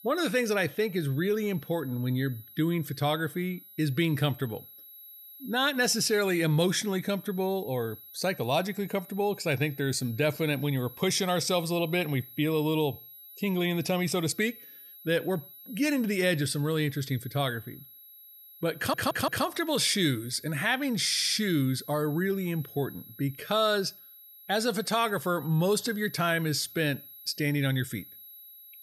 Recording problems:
high-pitched whine; noticeable; throughout; 11.5 kHz, 20 dB below the speech
audio stuttering; at 19 s and at 21 s

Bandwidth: 13.5 kHz